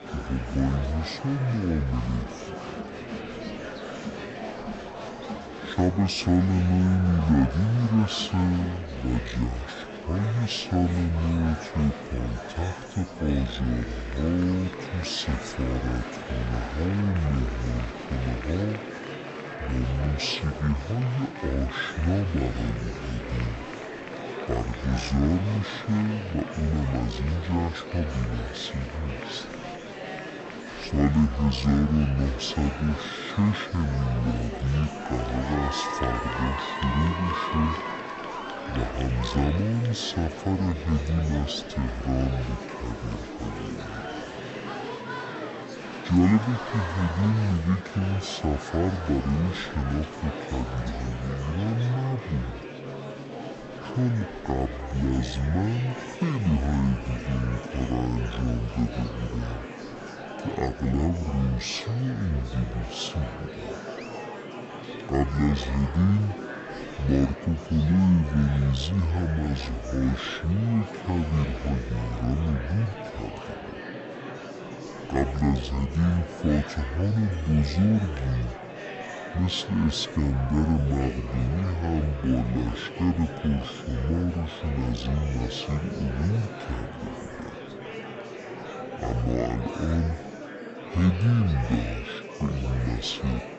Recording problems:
wrong speed and pitch; too slow and too low; 0.6 times normal speed
murmuring crowd; loud; throughout; 9 dB below the speech

